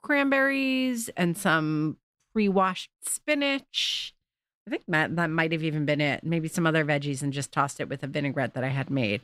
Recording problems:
none

